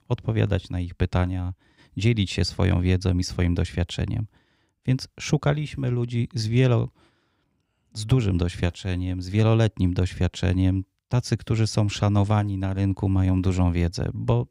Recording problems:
none

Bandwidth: 15.5 kHz